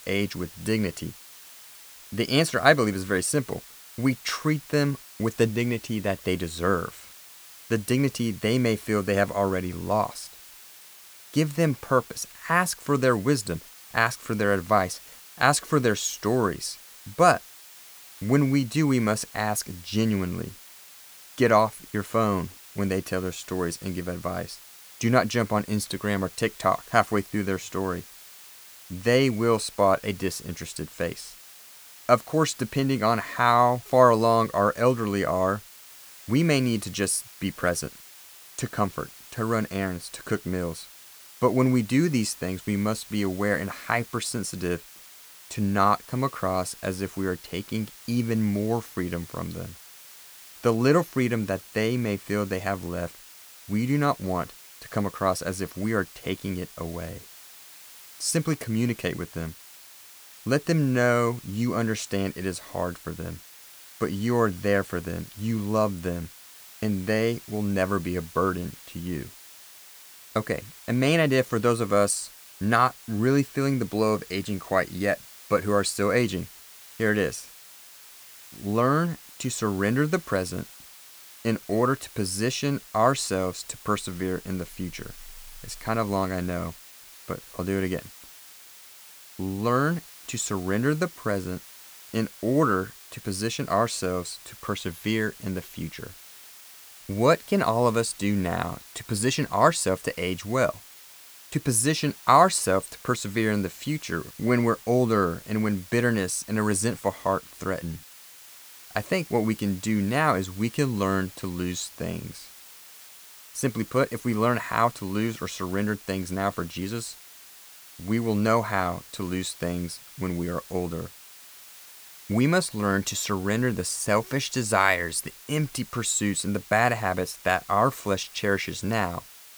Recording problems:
hiss; noticeable; throughout; 20 dB below the speech

